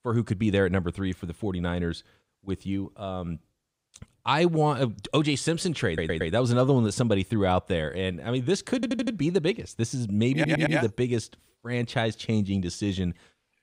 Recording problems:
audio stuttering; at 6 s, at 9 s and at 10 s

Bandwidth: 15.5 kHz